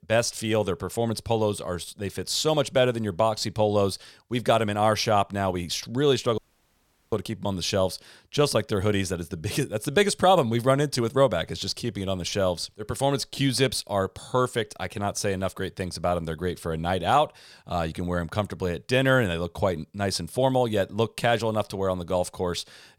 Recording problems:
audio cutting out; at 6.5 s for 0.5 s

